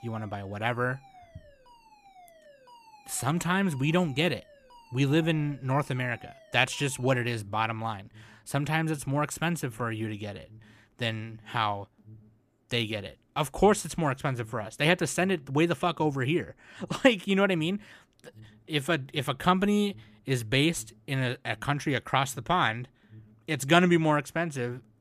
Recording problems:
alarms or sirens; faint; throughout; 25 dB below the speech

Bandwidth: 14.5 kHz